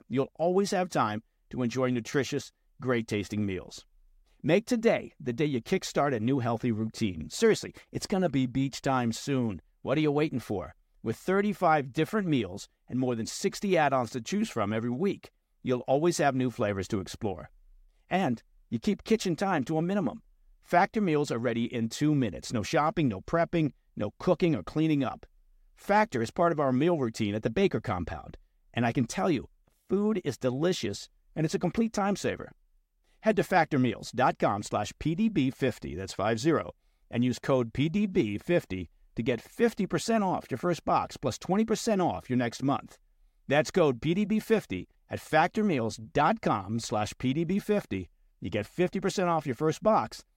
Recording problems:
none

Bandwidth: 16 kHz